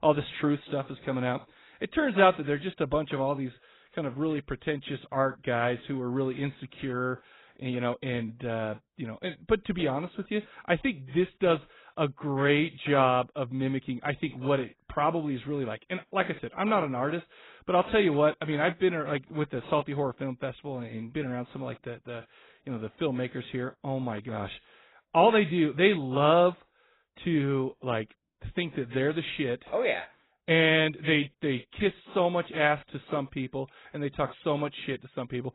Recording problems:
garbled, watery; badly; nothing above 4 kHz

